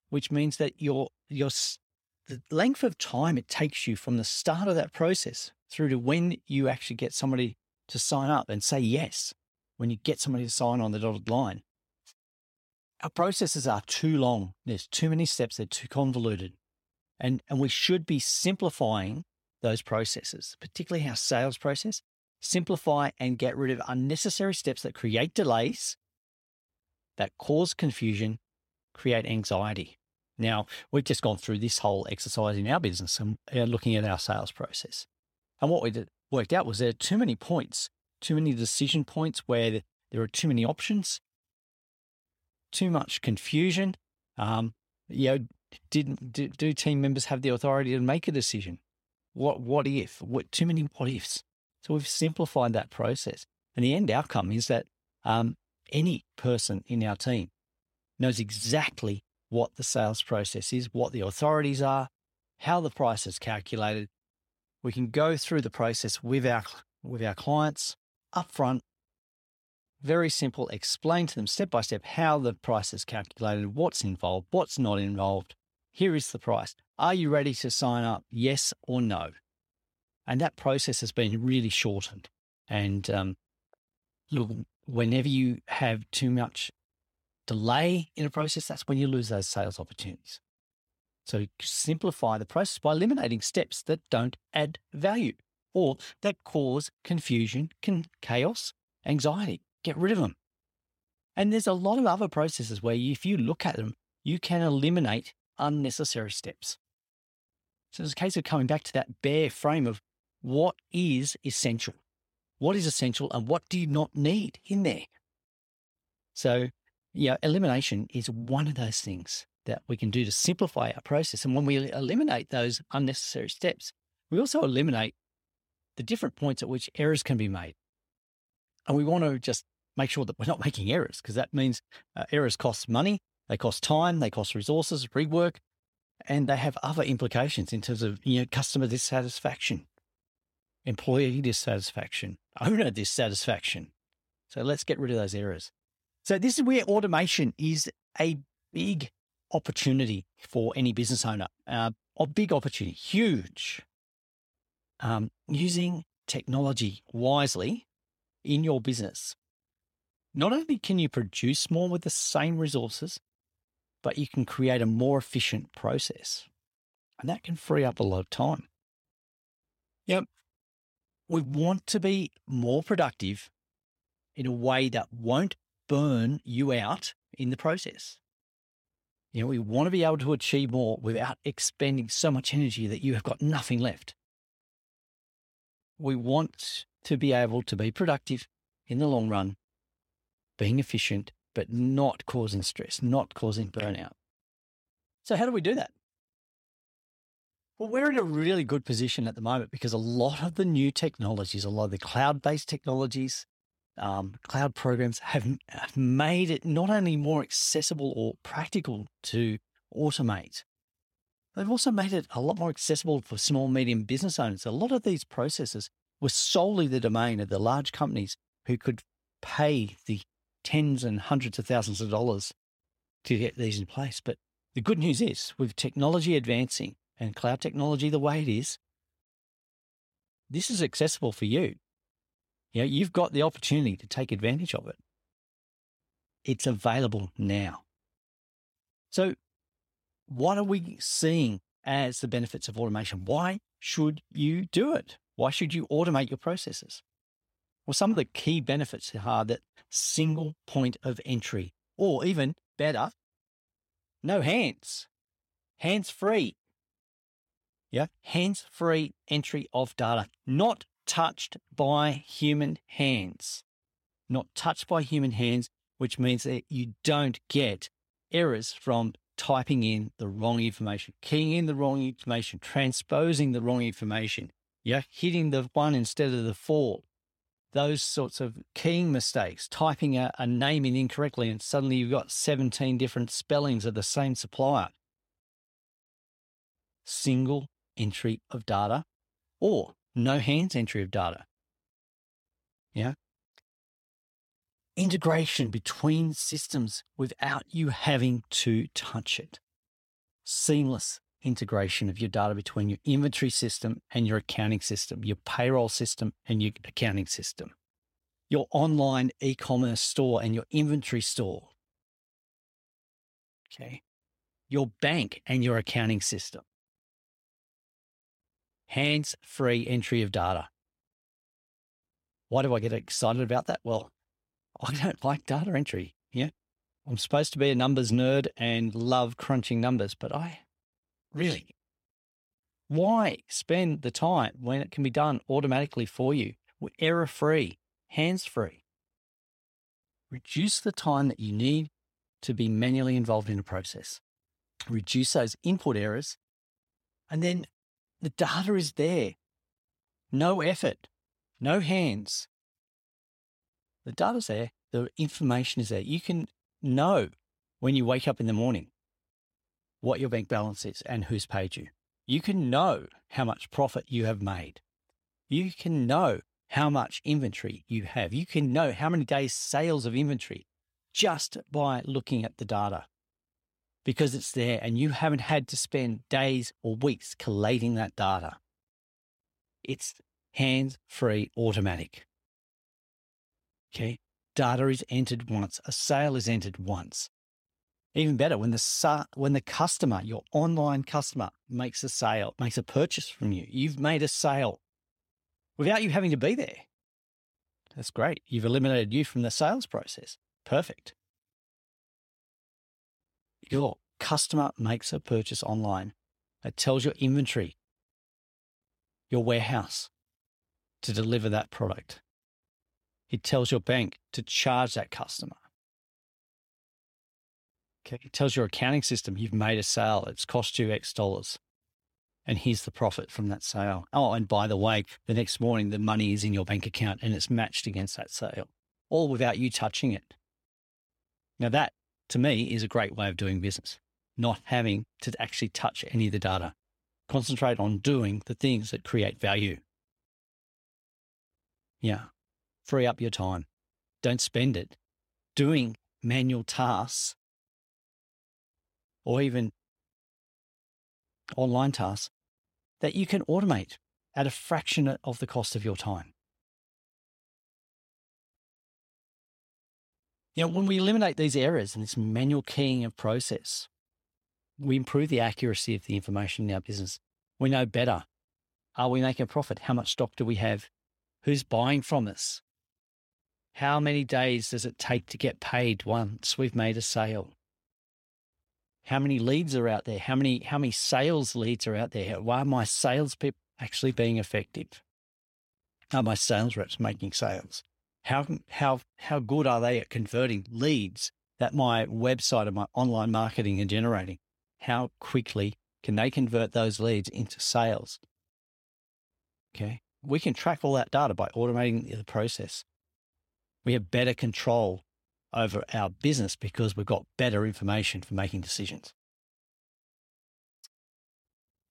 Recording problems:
none

